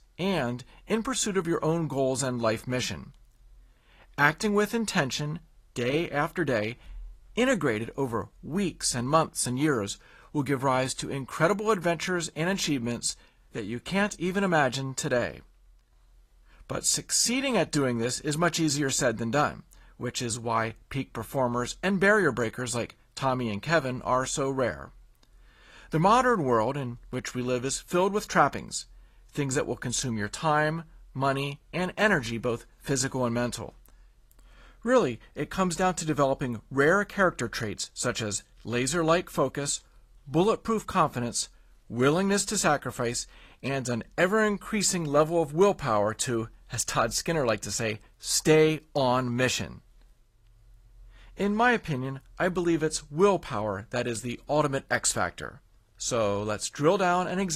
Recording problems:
garbled, watery; slightly; nothing above 14.5 kHz
abrupt cut into speech; at the end

